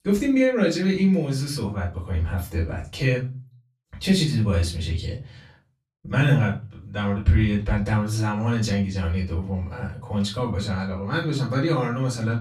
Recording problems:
off-mic speech; far
room echo; very slight; dies away in 0.3 s

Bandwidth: 14.5 kHz